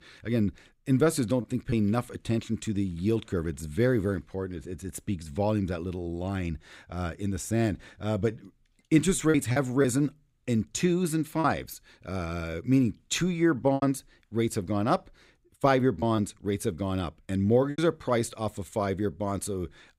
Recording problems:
choppy; occasionally; 3% of the speech affected

